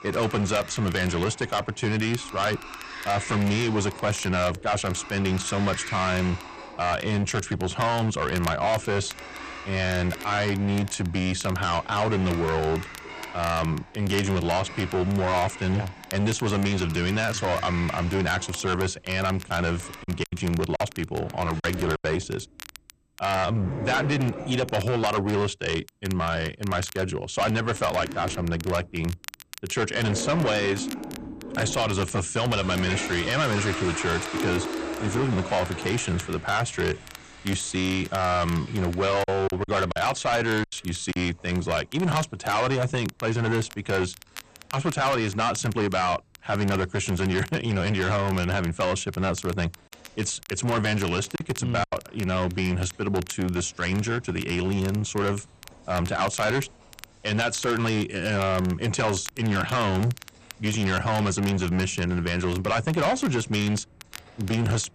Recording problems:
distortion; heavy; 12% of the sound clipped
garbled, watery; slightly; nothing above 8.5 kHz
household noises; noticeable; throughout; 10 dB below the speech
crackle, like an old record; noticeable; 20 dB below the speech
choppy; very; from 20 to 22 s, from 39 to 41 s and at 51 s; 8% of the speech affected

